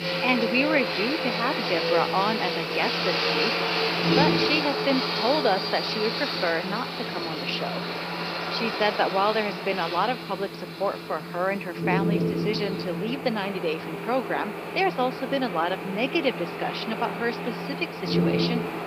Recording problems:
thin; somewhat; fading below 400 Hz
high frequencies cut off; noticeable; nothing above 5.5 kHz
train or aircraft noise; loud; throughout; 1 dB below the speech
wind noise on the microphone; occasional gusts; 10 dB below the speech
hiss; faint; throughout; 25 dB below the speech

